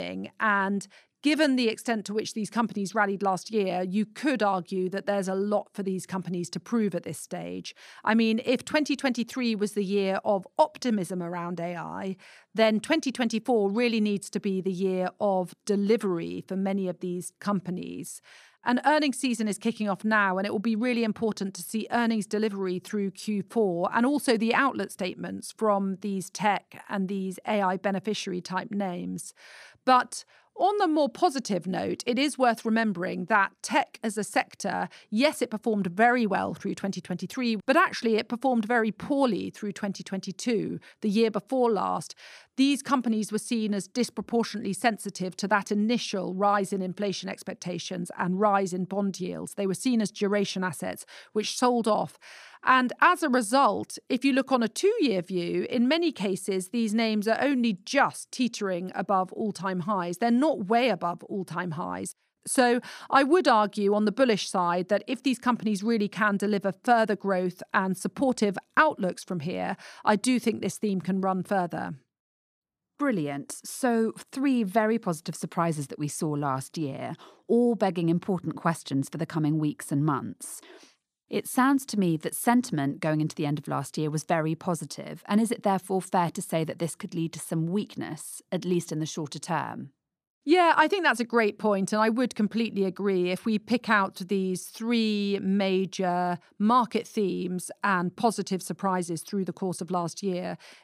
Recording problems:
abrupt cut into speech; at the start

